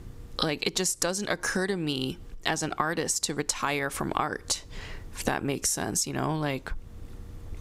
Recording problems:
squashed, flat; heavily

